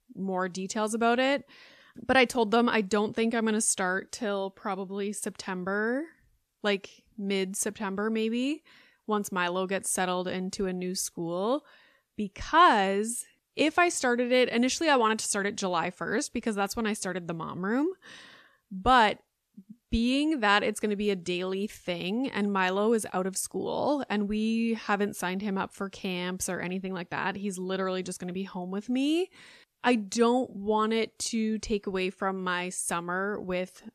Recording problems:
none

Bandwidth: 14.5 kHz